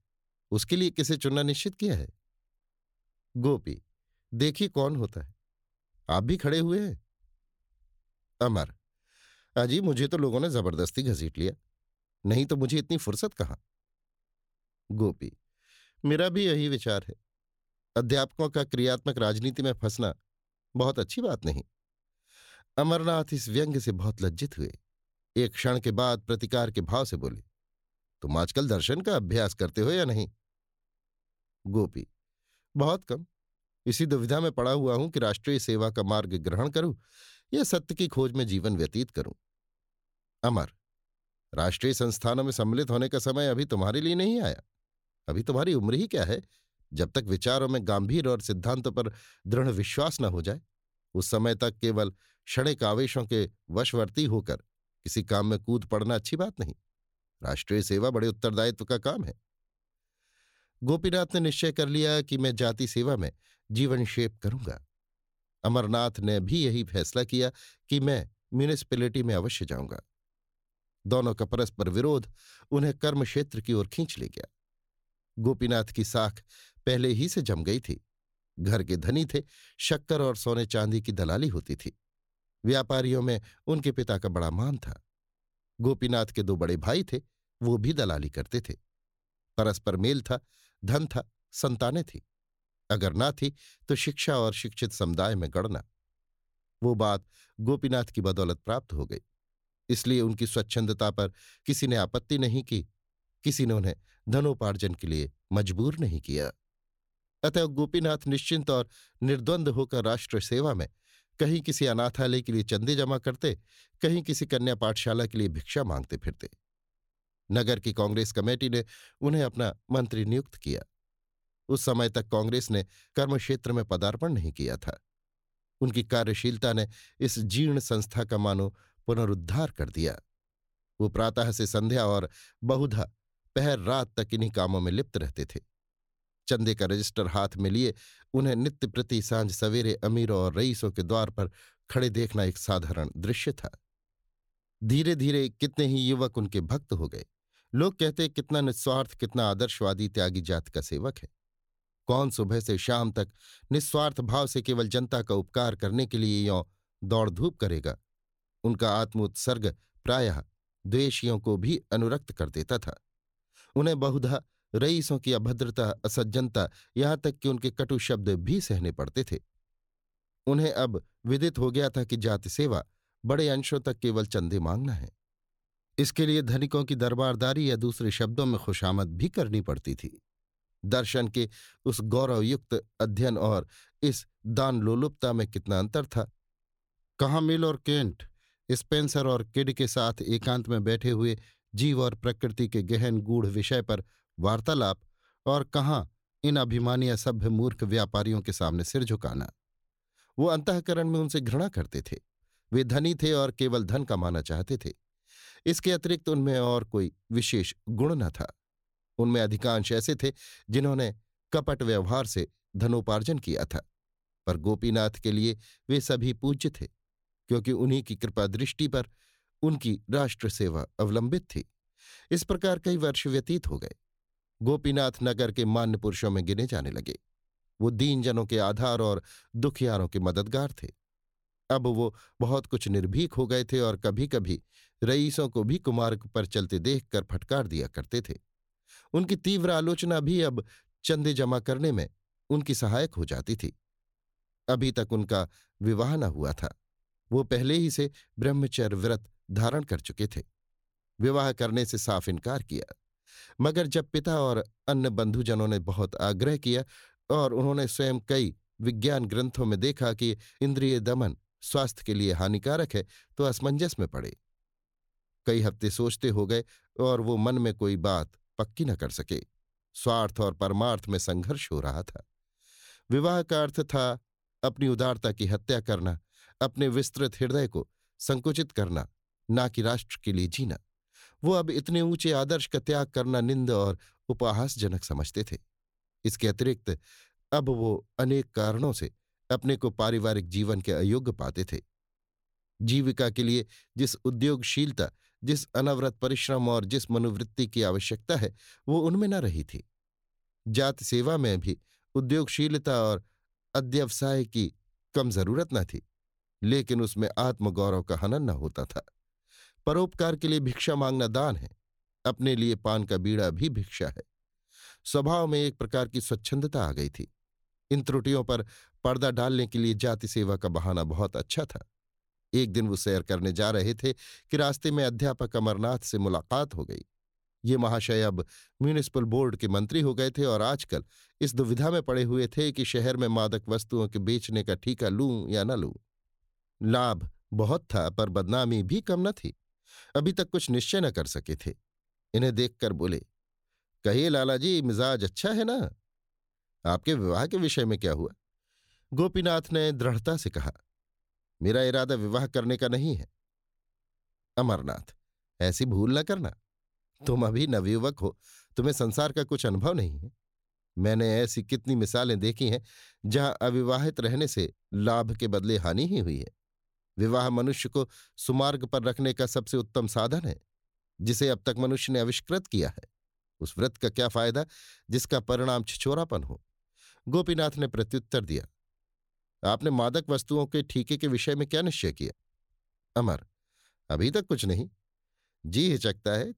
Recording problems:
none

